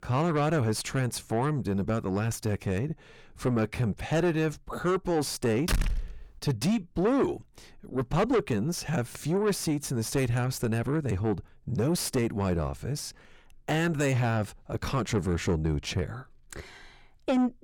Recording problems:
distortion; heavy; 6 dB below the speech
door banging; noticeable; at 5.5 s; peak 1 dB below the speech

